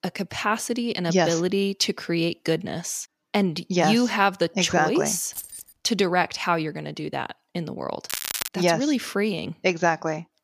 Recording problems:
crackling; loud; at 8 s, mostly in the pauses; 5 dB below the speech
jangling keys; faint; at 5.5 s; peak 10 dB below the speech

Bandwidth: 15 kHz